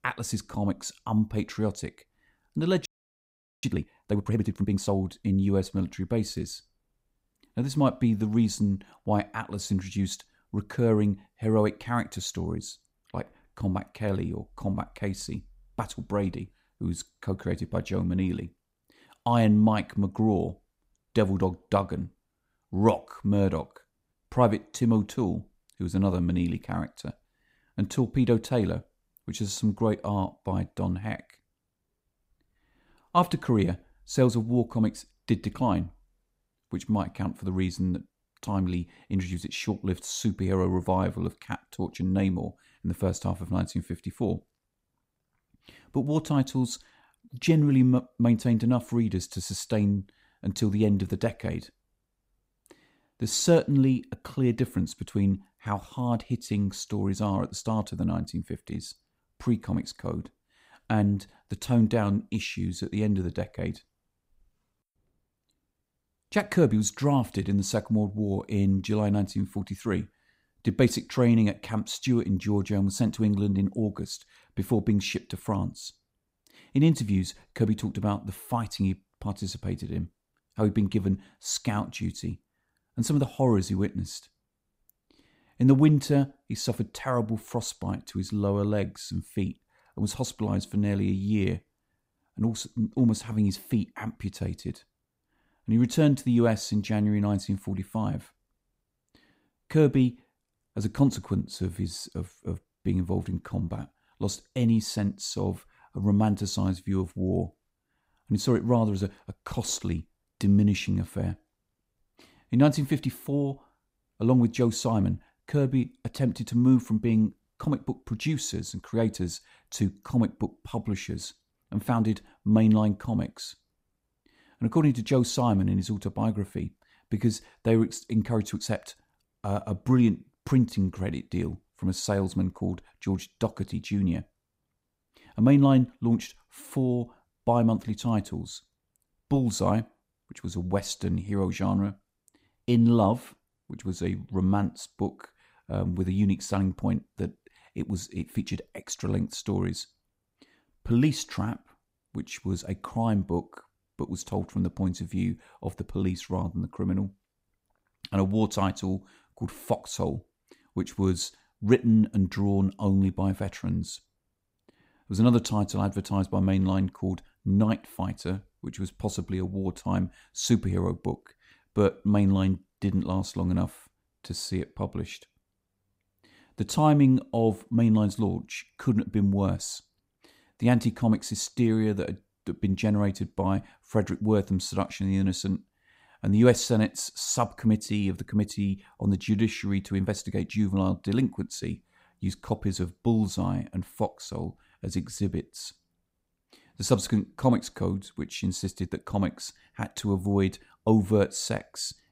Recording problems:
audio freezing; at 3 s for 1 s

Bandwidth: 15.5 kHz